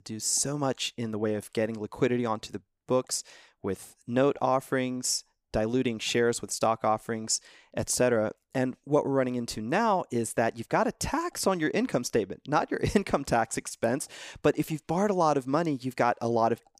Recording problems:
none

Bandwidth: 15 kHz